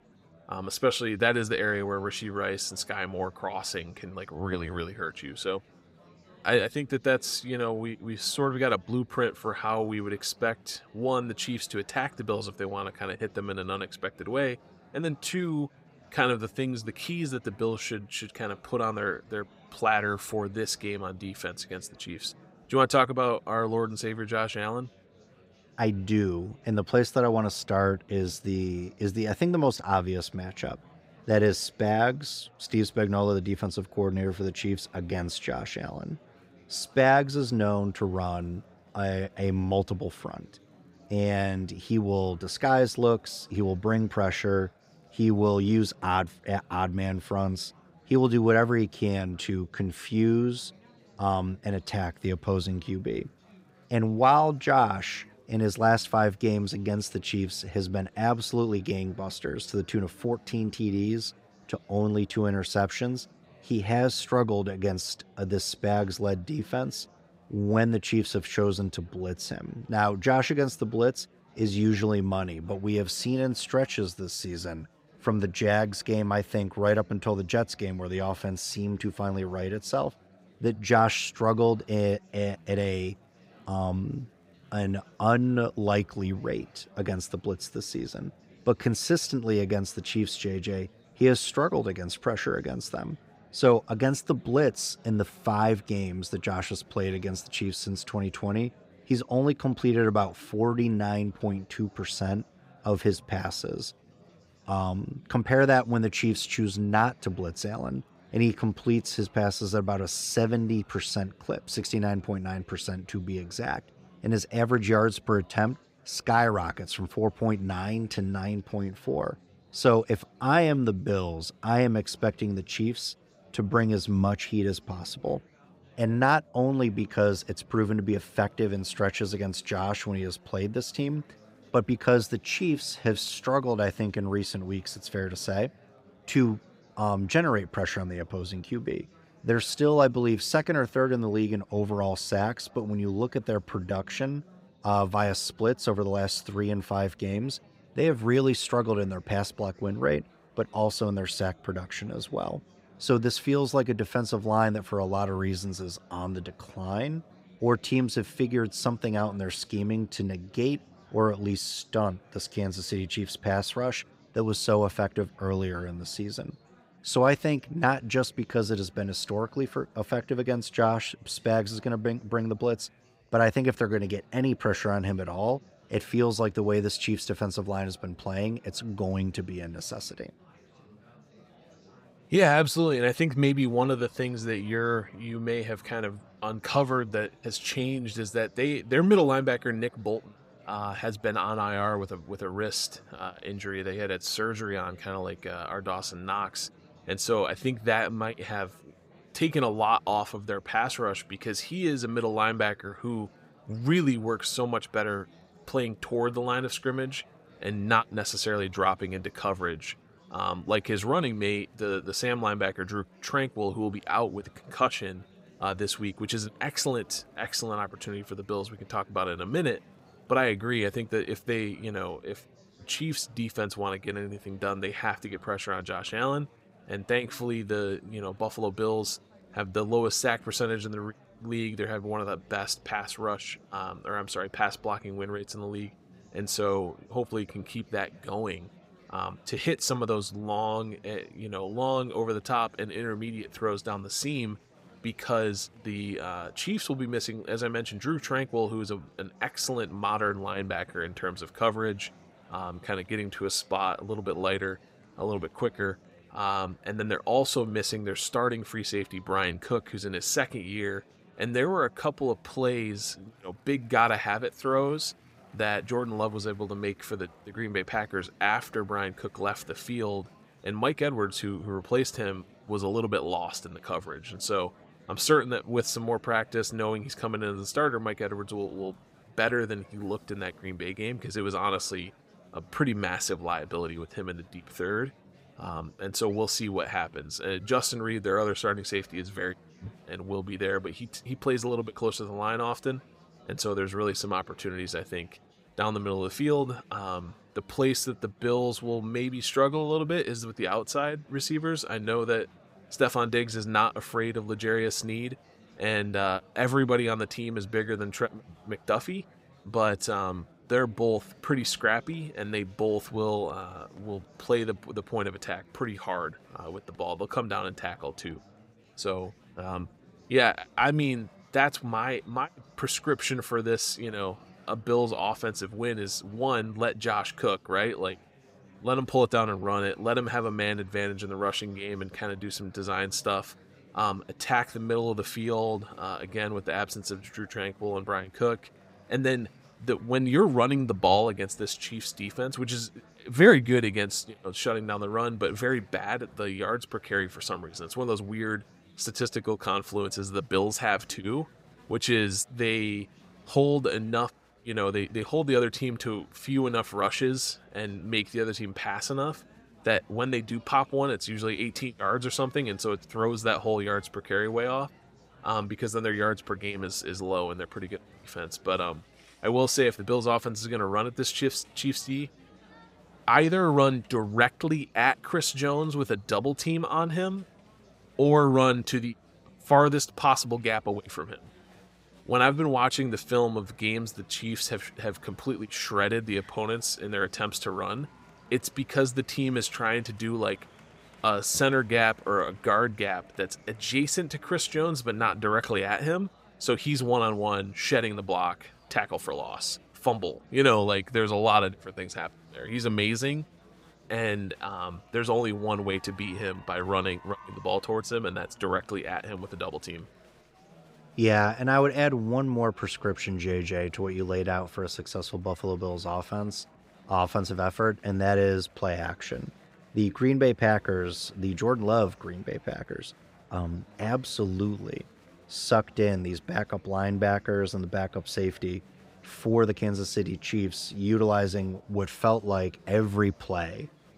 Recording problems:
chatter from many people; faint; throughout; 30 dB below the speech

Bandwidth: 15.5 kHz